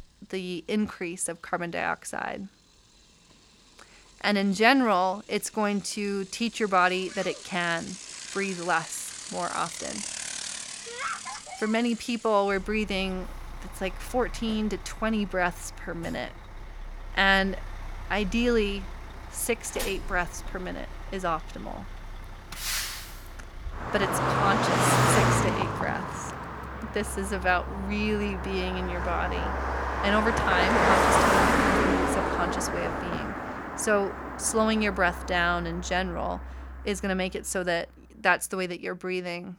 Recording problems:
traffic noise; loud; throughout; 1 dB below the speech

